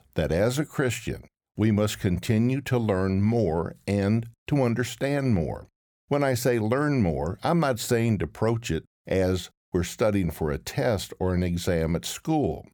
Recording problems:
none

